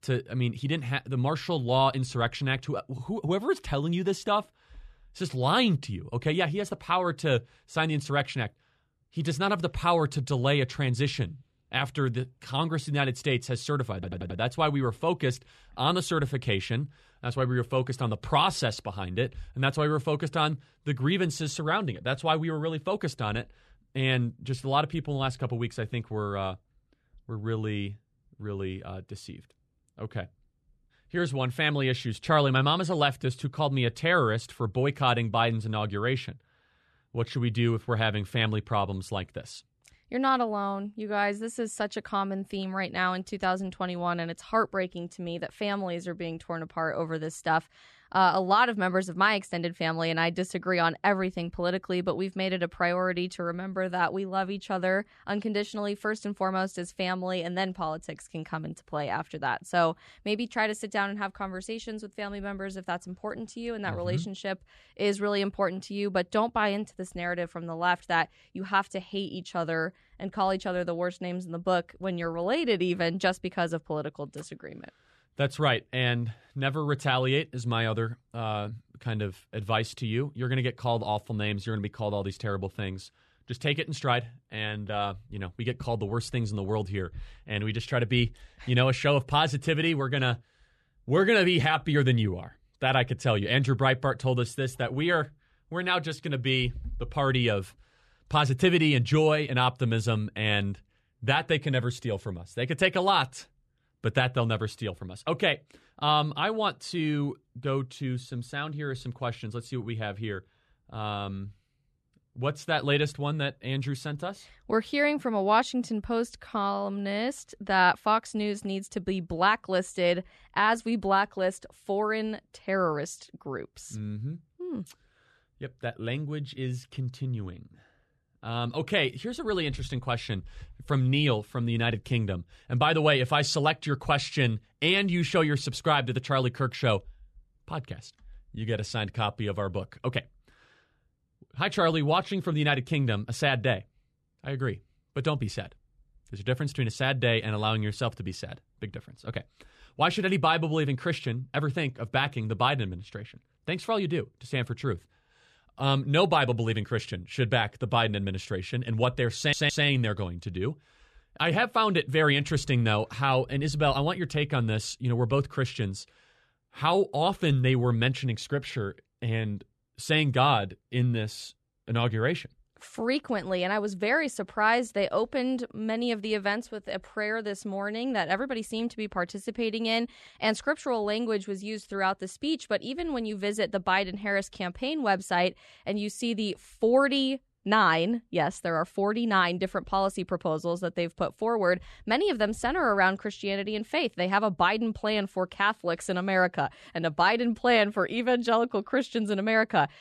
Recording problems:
audio stuttering; at 14 s and at 2:39

